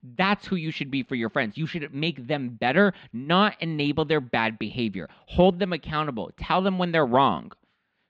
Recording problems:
muffled; very slightly; fading above 4 kHz

